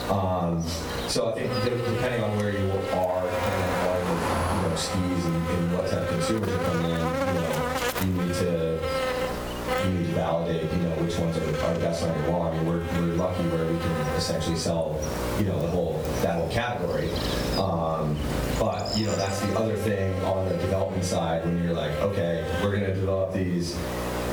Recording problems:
off-mic speech; far
room echo; slight; dies away in 0.3 s
squashed, flat; somewhat, background pumping
electrical hum; loud; throughout; 60 Hz, 3 dB below the speech
traffic noise; loud; until 19 s; 9 dB below the speech

